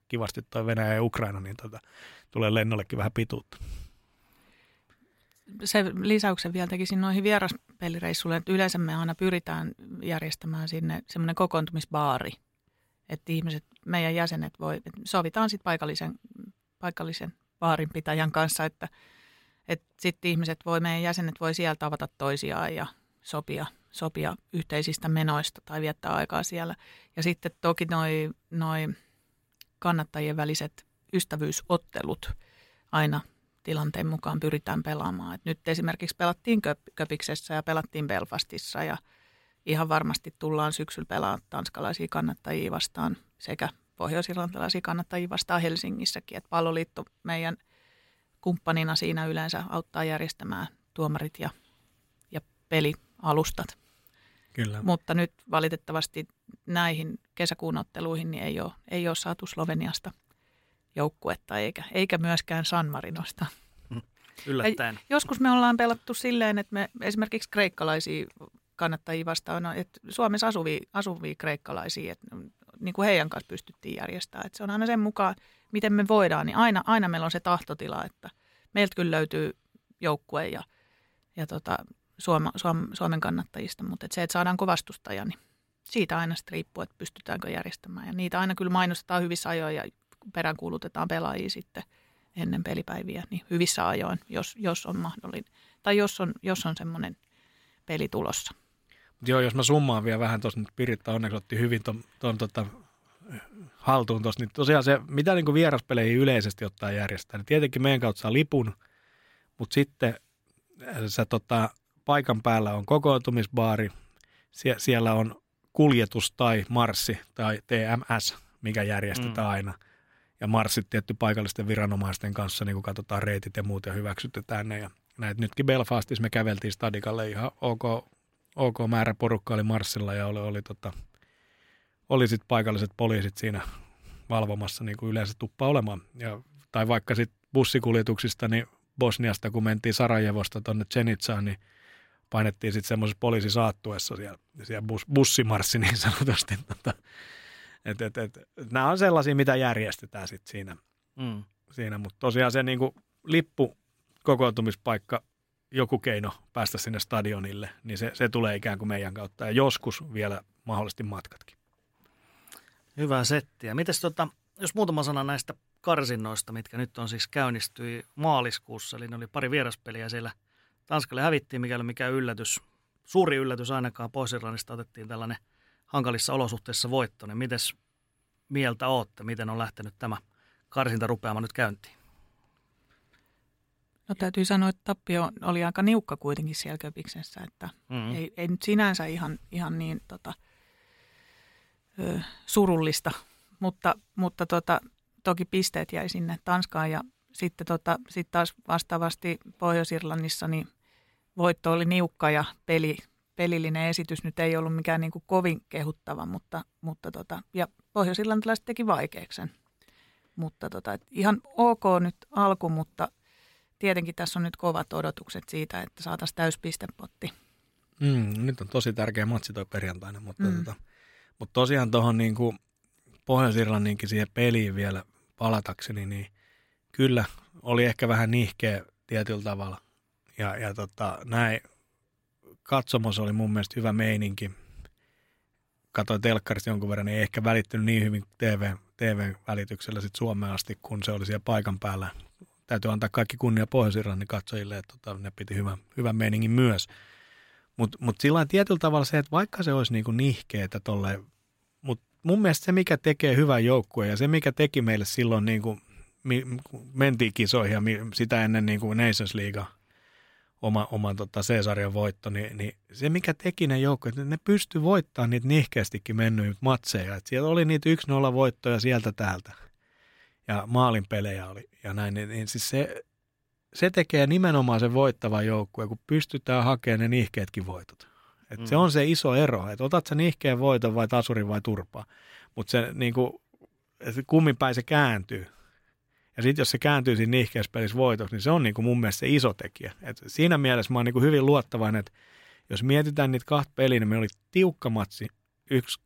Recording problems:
none

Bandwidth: 16 kHz